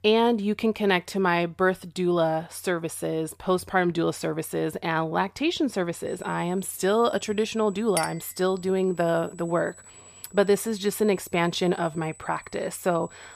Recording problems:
high-pitched whine; faint; from 6 s on; 8 kHz, 25 dB below the speech
clattering dishes; noticeable; at 8 s; peak 6 dB below the speech

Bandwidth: 15 kHz